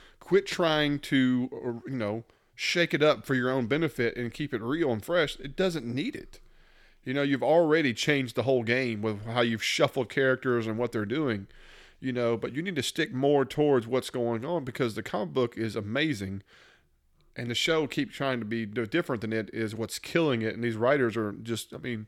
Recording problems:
none

